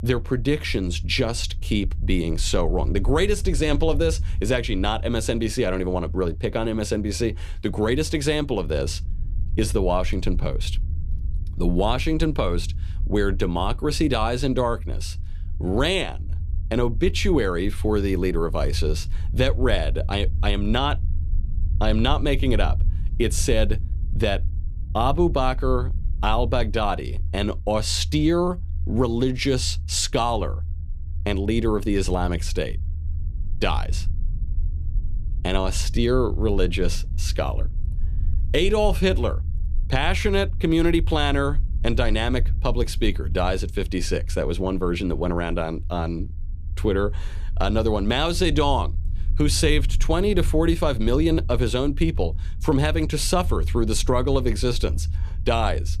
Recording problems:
low rumble; faint; throughout; 20 dB below the speech

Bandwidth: 14.5 kHz